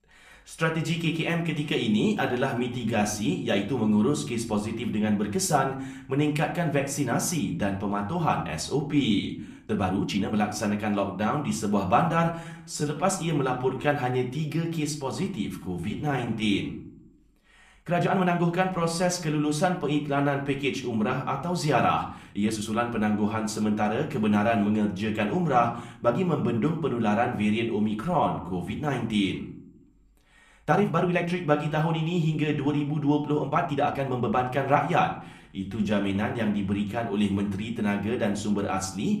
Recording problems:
room echo; slight; dies away in 0.4 s
off-mic speech; somewhat distant
uneven, jittery; strongly; from 2 to 36 s

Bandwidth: 14.5 kHz